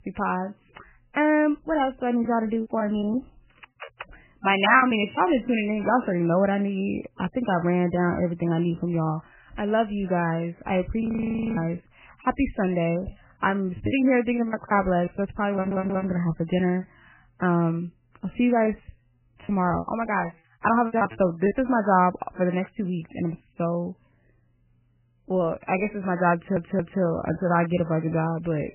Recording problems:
garbled, watery; badly; nothing above 3 kHz
choppy; very; from 2 to 5 s, from 13 to 16 s and from 19 to 22 s; 15% of the speech affected
audio freezing; at 11 s for 0.5 s
audio stuttering; at 16 s and at 26 s

